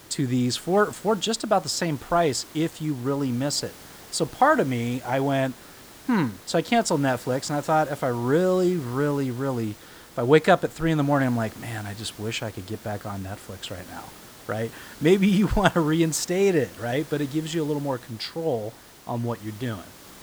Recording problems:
hiss; noticeable; throughout; 20 dB below the speech

